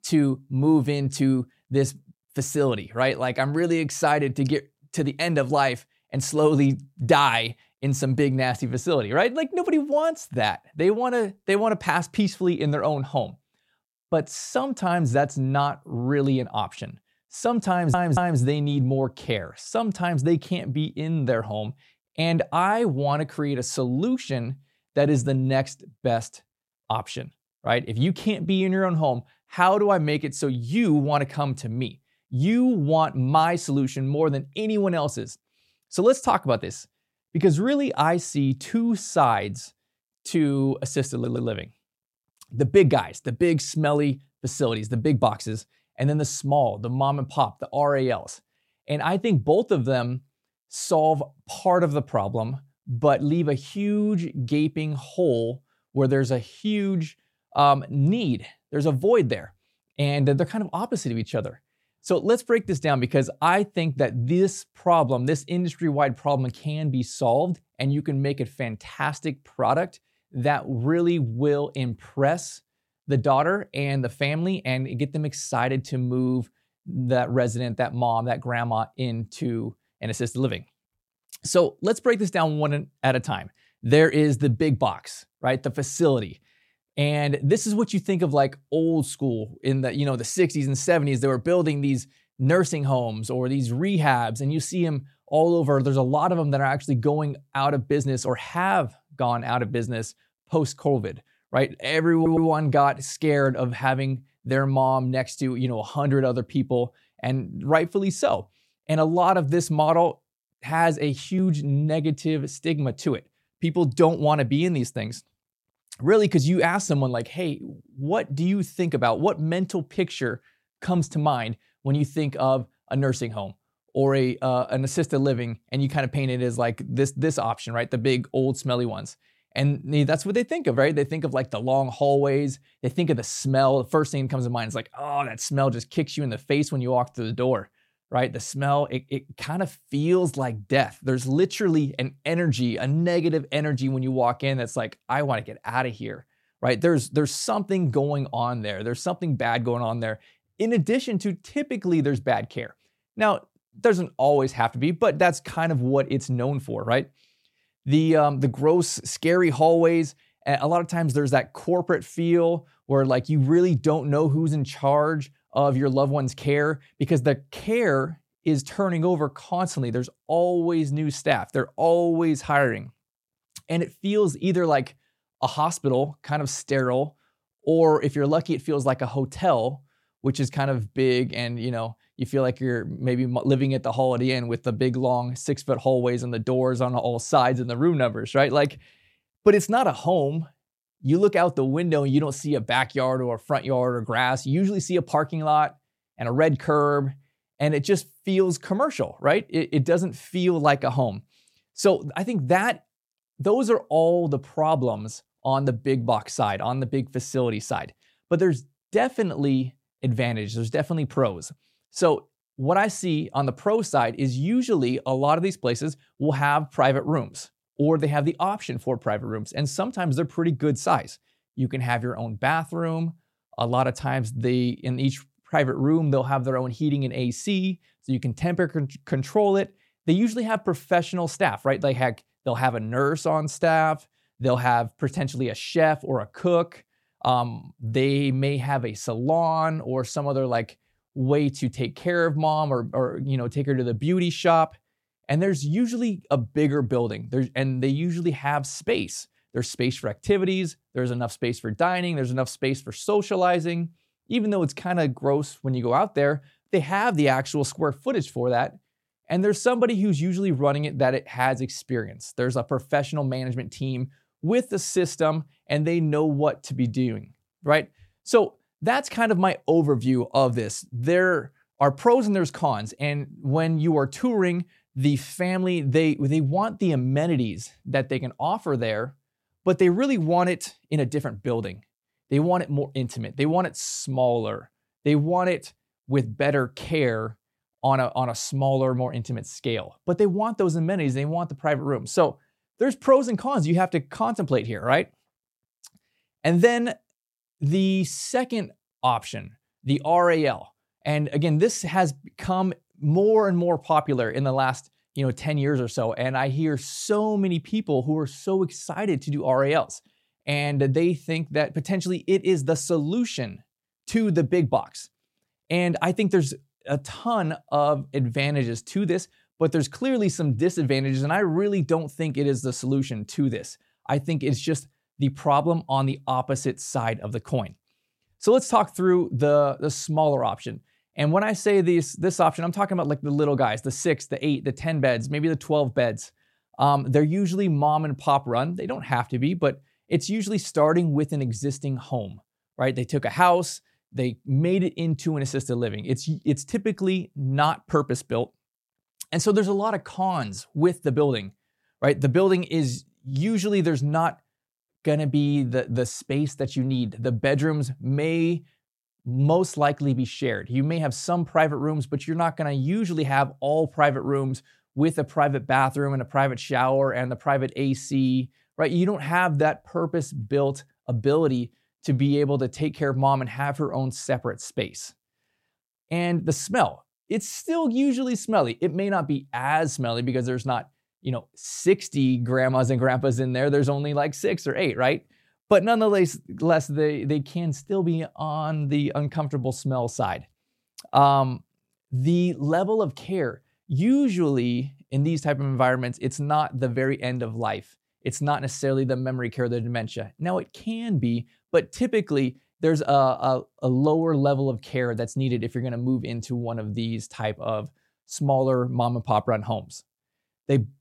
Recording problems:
audio stuttering; at 18 s, at 41 s and at 1:42

